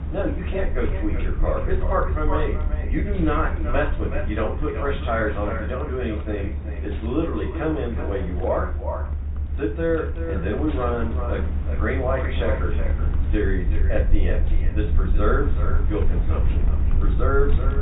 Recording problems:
echo of what is said; strong; throughout; 380 ms later, 10 dB below the speech
off-mic speech; far
high frequencies cut off; severe; nothing above 4 kHz
room echo; slight; dies away in 0.3 s
wind noise on the microphone; occasional gusts; 15 dB below the speech
low rumble; noticeable; throughout; 15 dB below the speech

